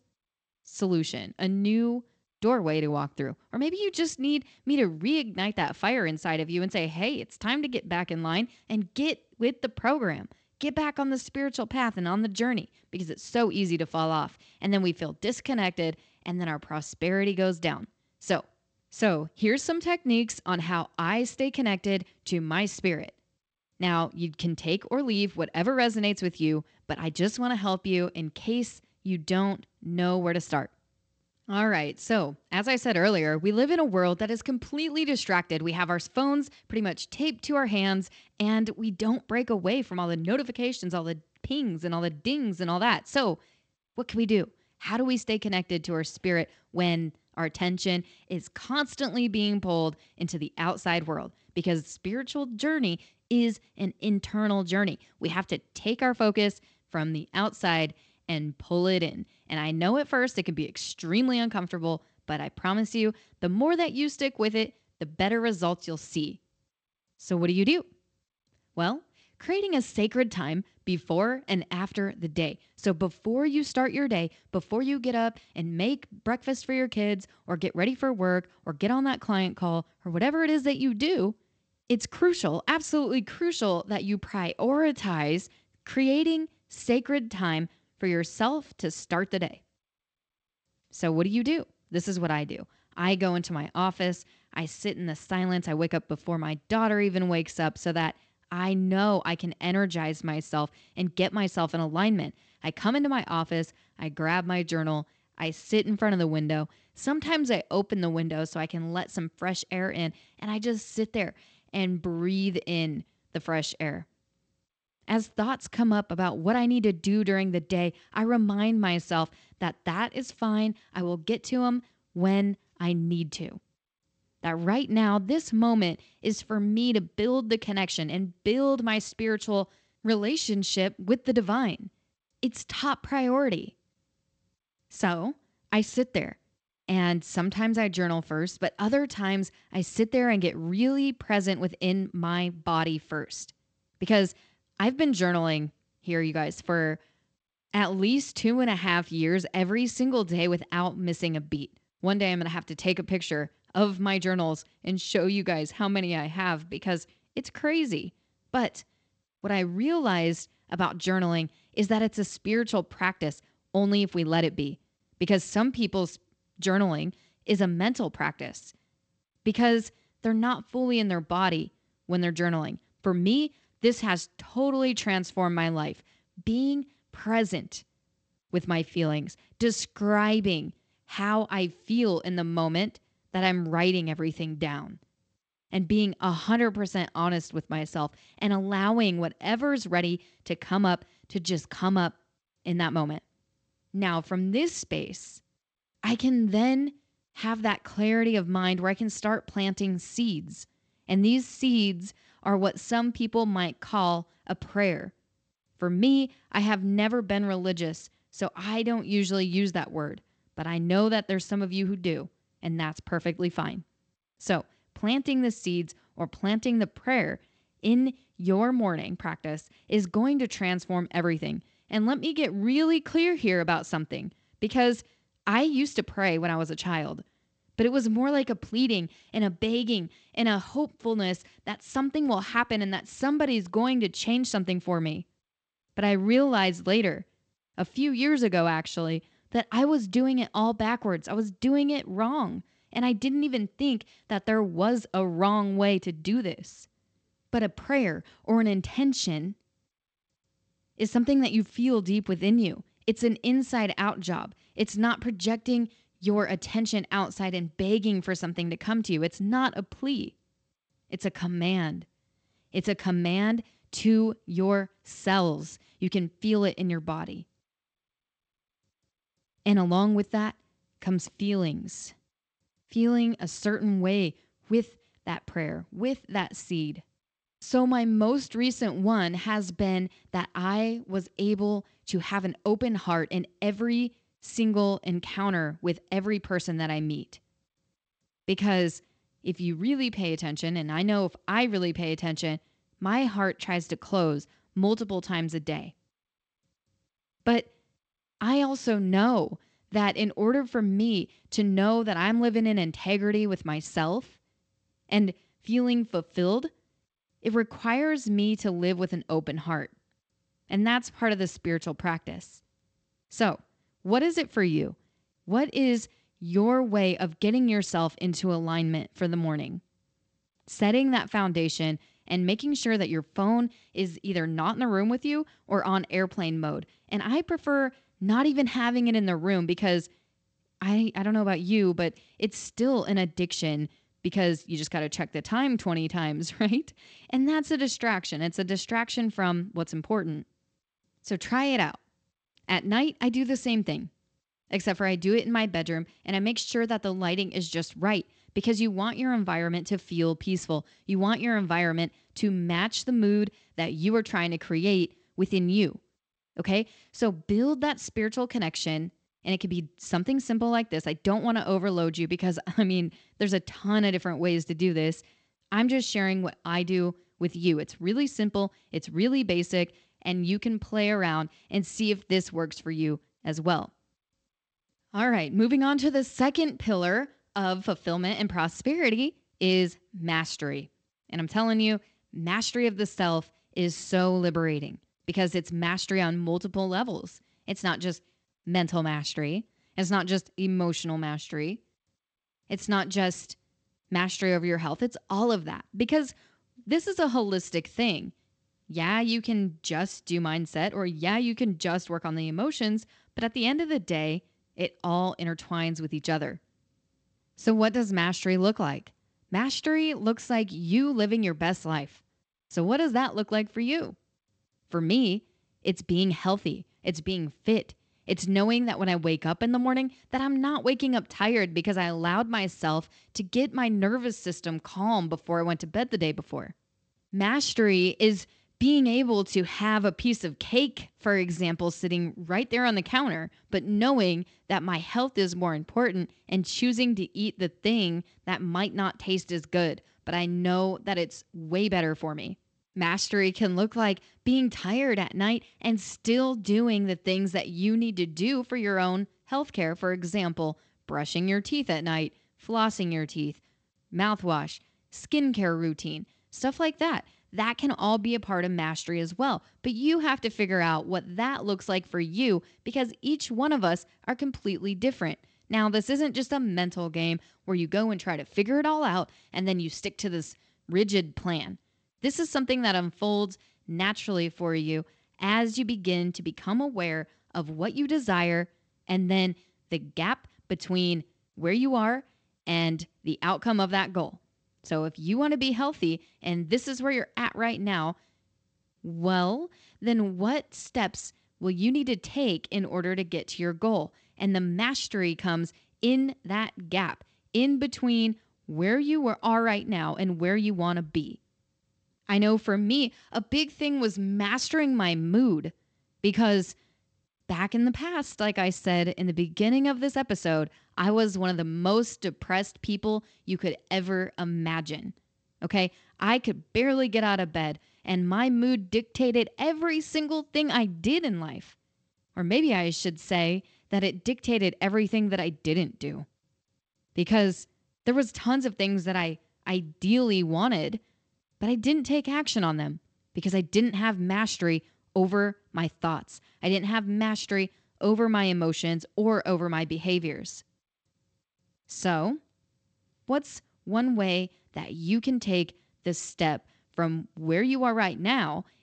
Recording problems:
garbled, watery; slightly; nothing above 8 kHz

